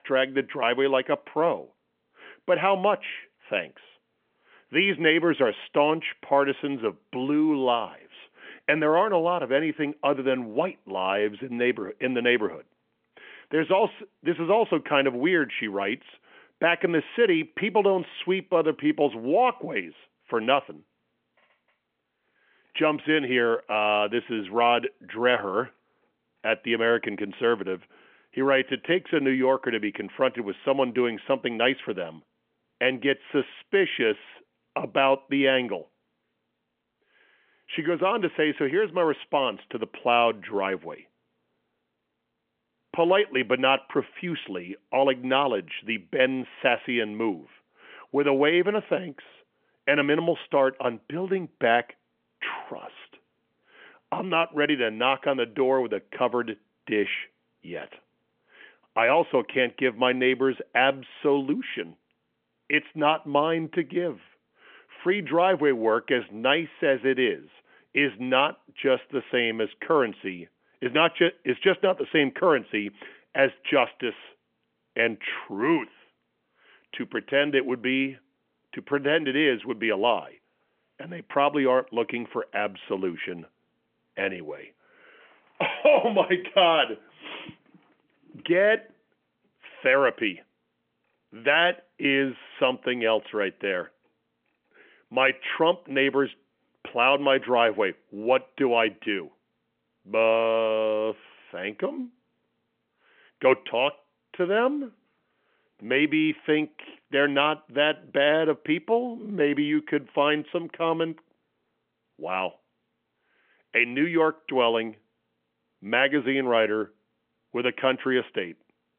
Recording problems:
phone-call audio; nothing above 3.5 kHz

